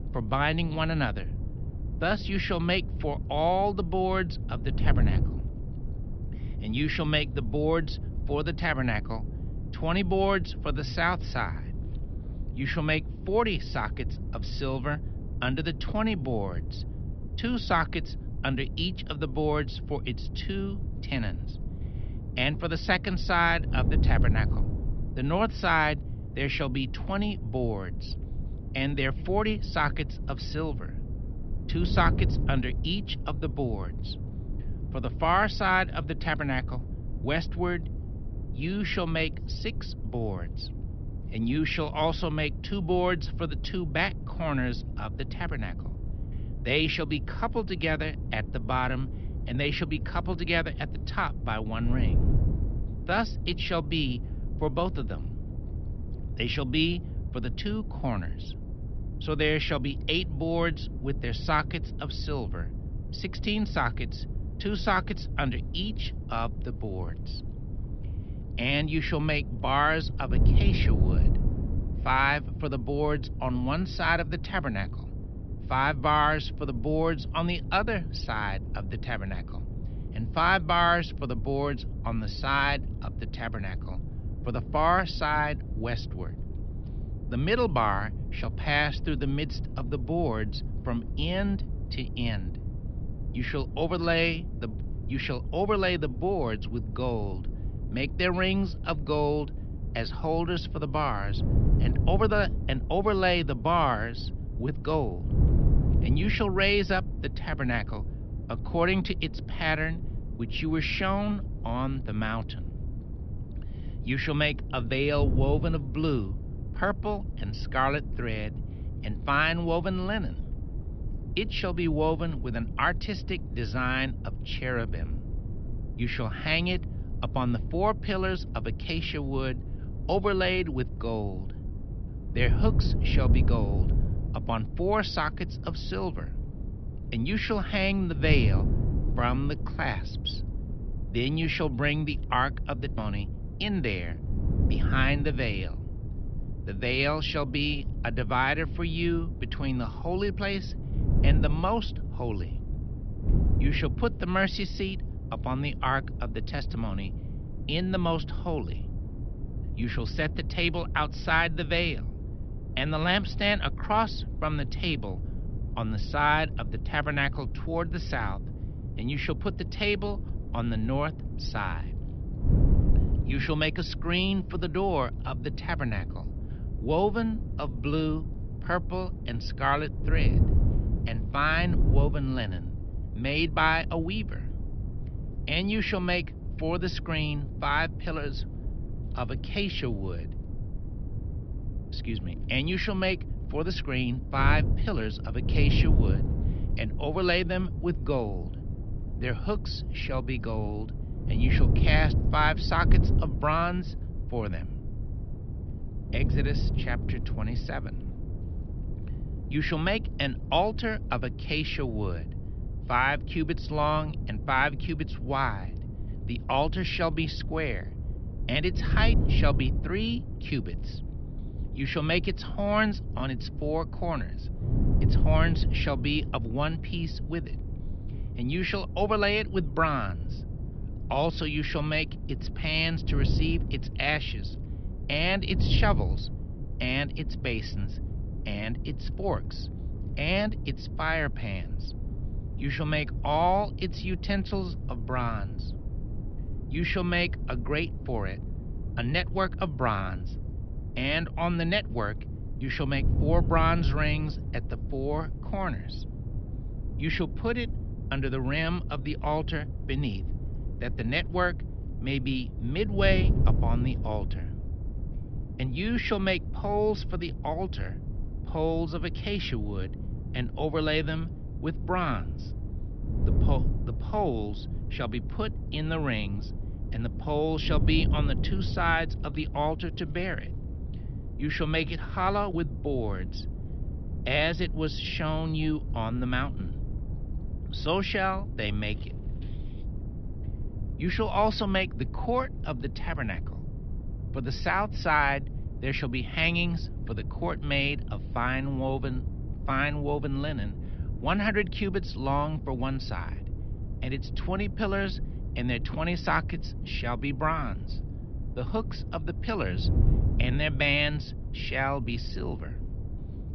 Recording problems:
high frequencies cut off; noticeable; nothing above 5.5 kHz
wind noise on the microphone; occasional gusts; 15 dB below the speech

